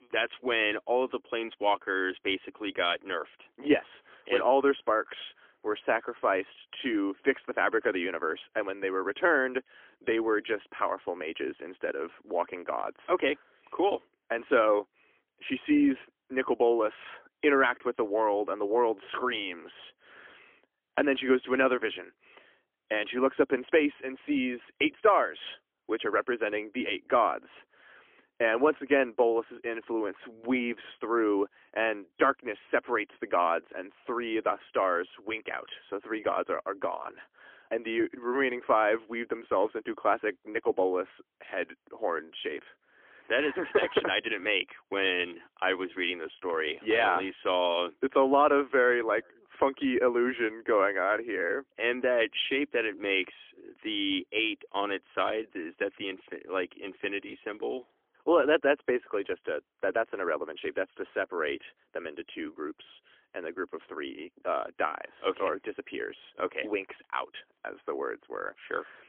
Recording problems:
phone-call audio; poor line; nothing above 3.5 kHz

